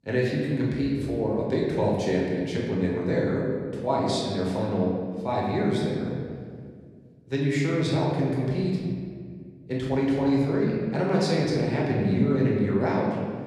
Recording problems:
off-mic speech; far
room echo; noticeable; dies away in 1.7 s

